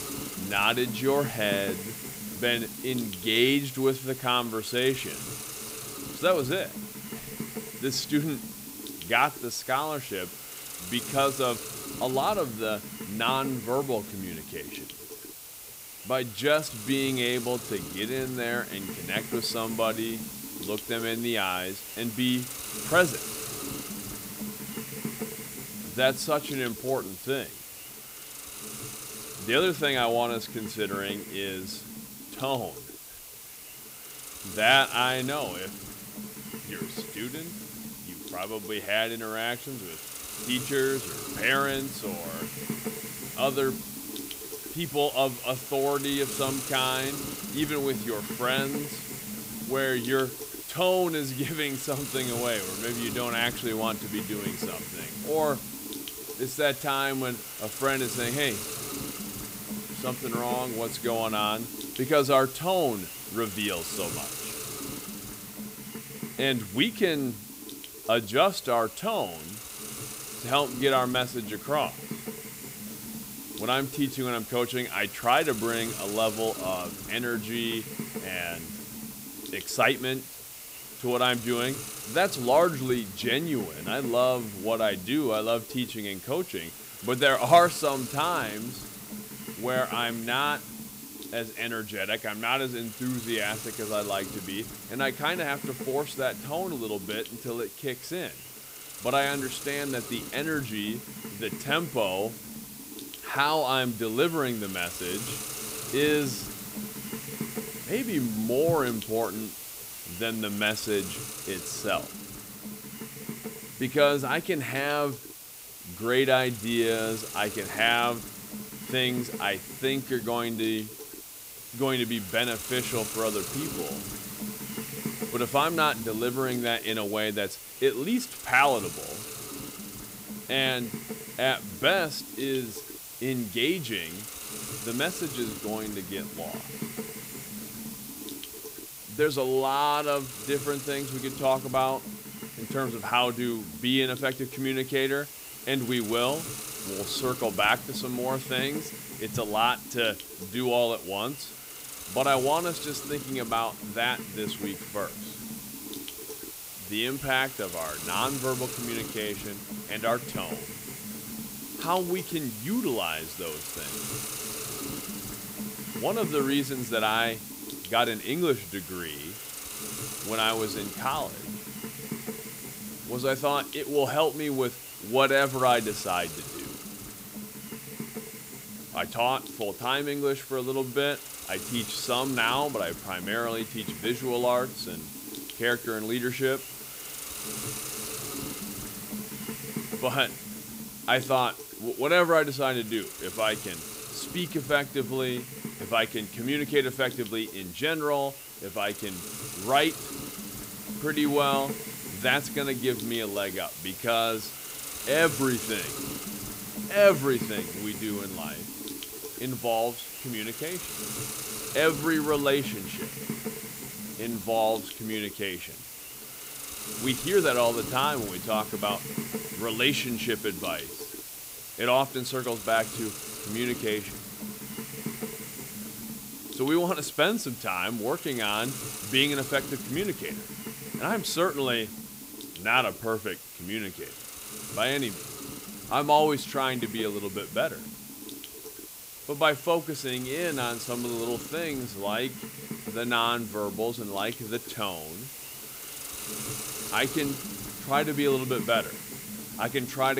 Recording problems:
hiss; loud; throughout; 9 dB below the speech
abrupt cut into speech; at the end

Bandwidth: 15.5 kHz